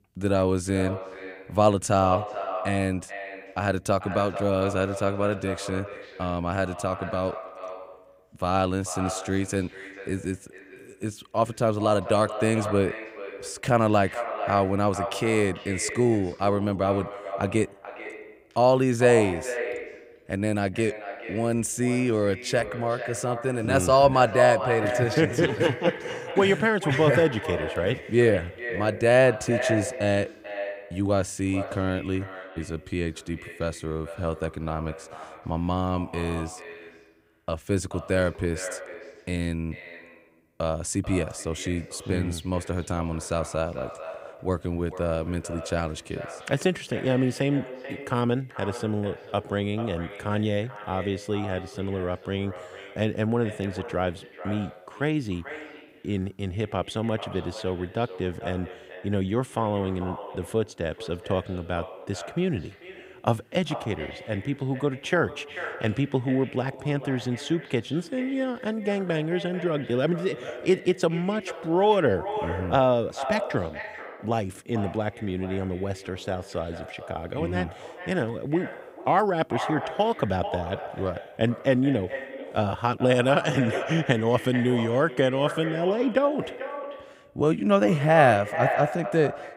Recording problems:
echo of what is said; strong; throughout; 440 ms later, 10 dB below the speech

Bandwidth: 15.5 kHz